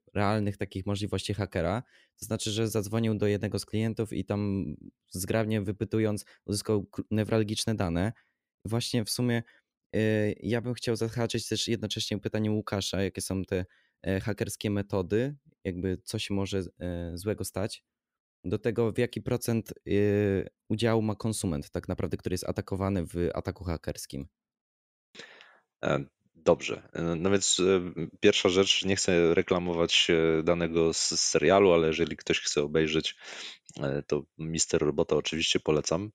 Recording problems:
none

